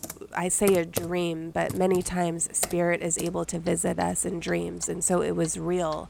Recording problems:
household noises; noticeable; throughout; 10 dB below the speech

